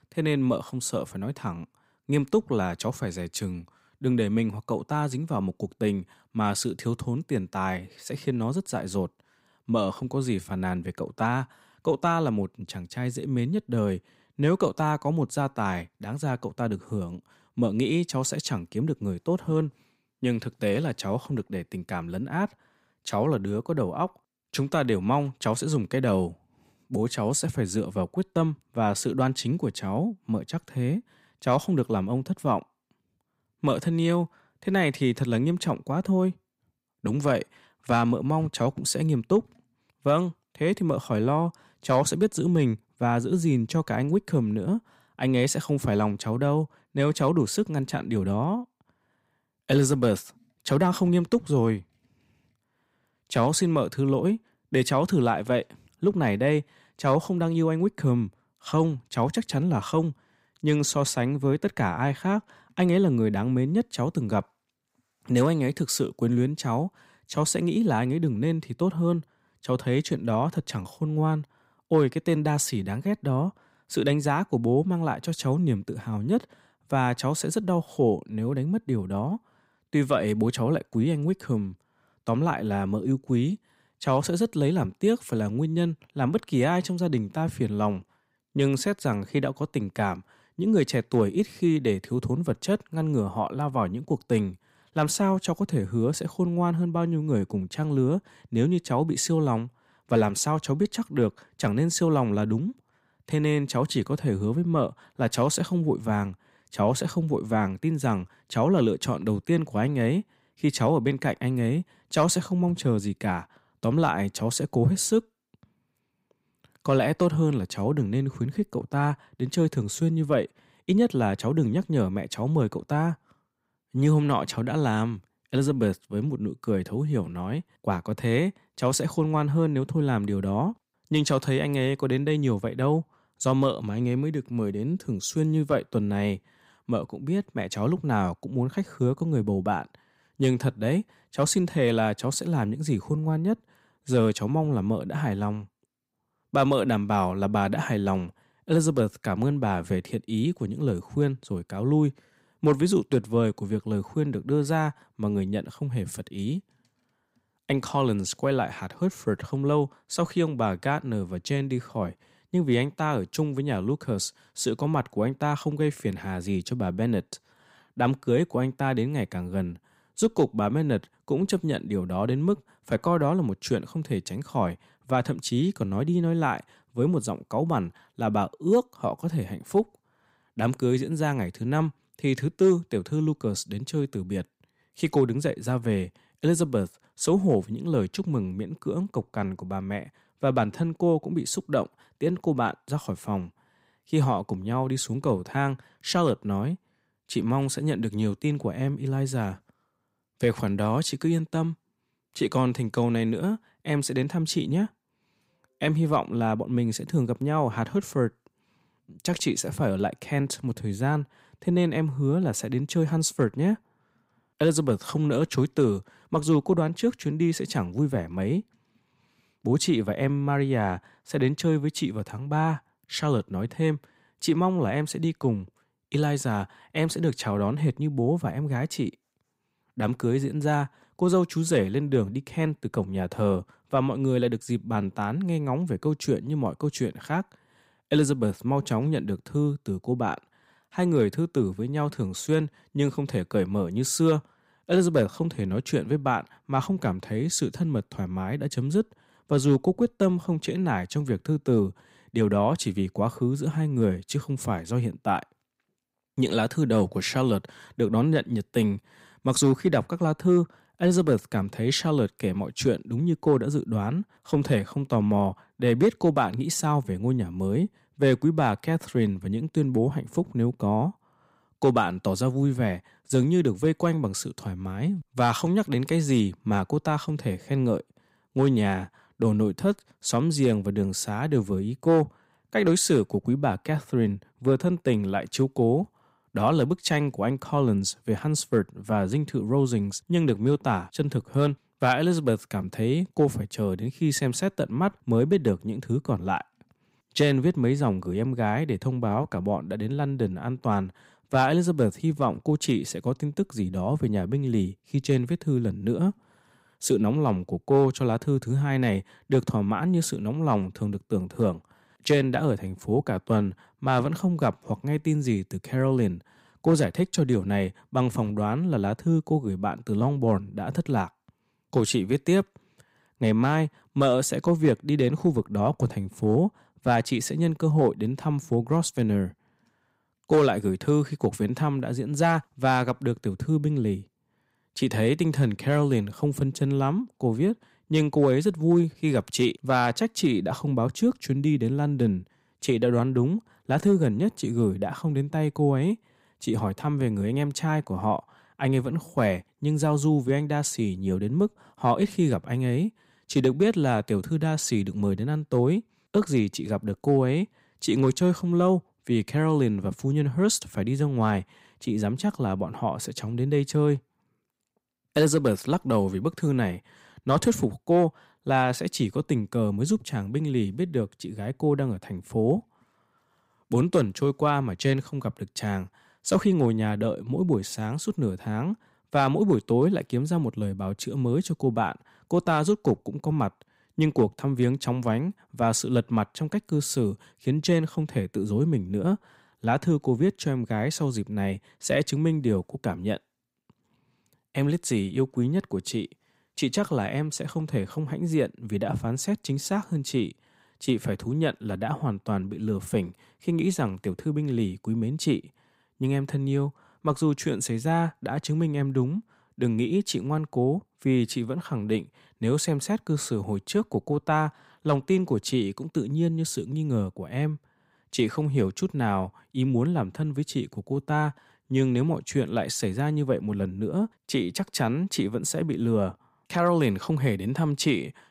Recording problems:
none

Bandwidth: 15.5 kHz